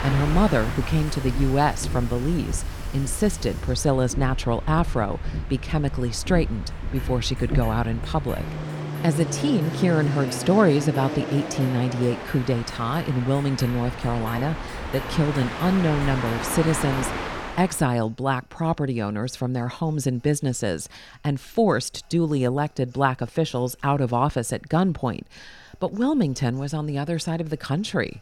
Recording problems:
train or aircraft noise; loud; until 18 s; 7 dB below the speech
household noises; faint; throughout; 20 dB below the speech

